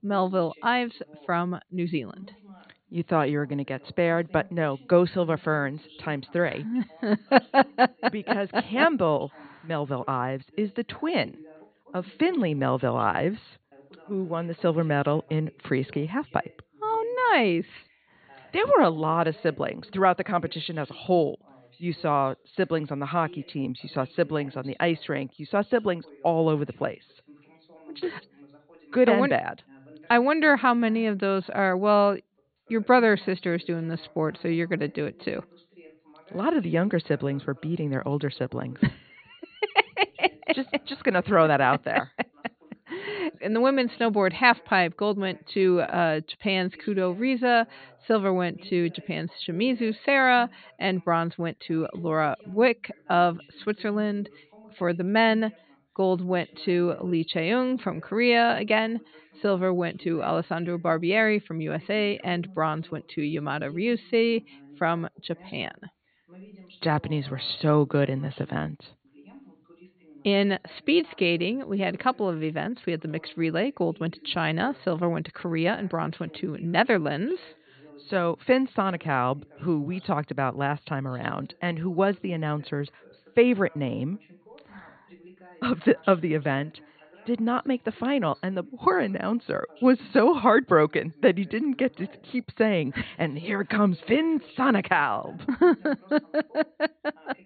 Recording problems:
high frequencies cut off; severe; nothing above 4.5 kHz
voice in the background; faint; throughout; 25 dB below the speech

